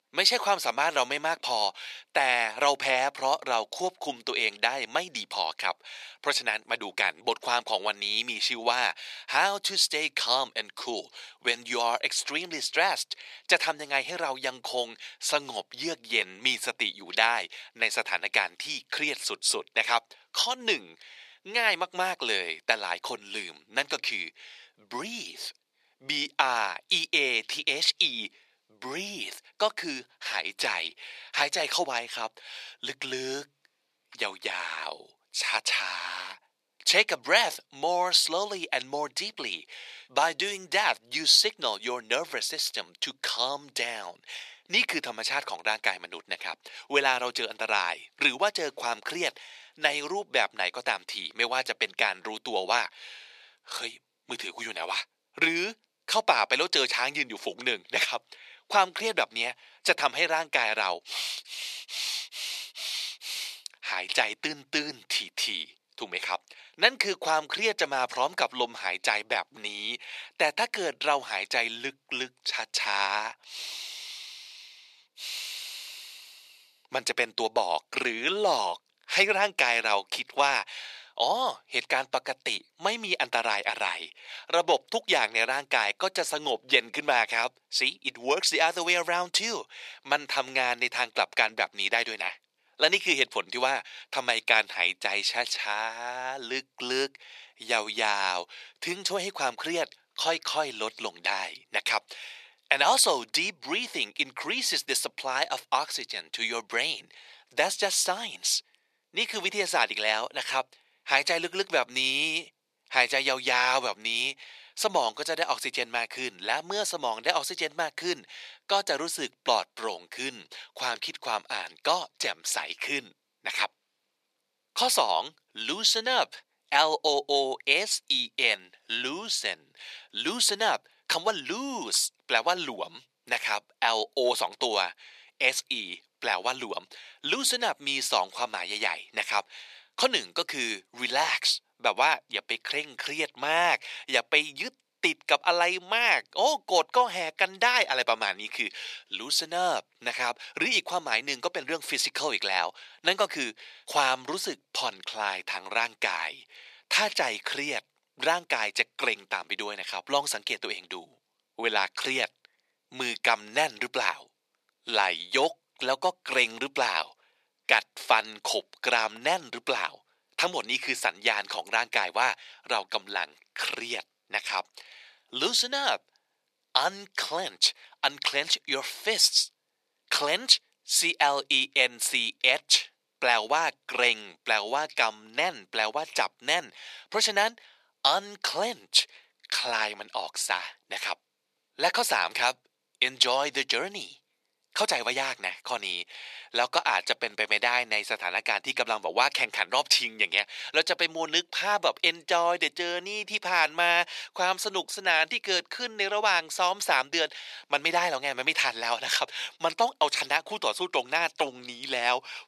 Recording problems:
thin; very; fading below 450 Hz

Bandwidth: 14 kHz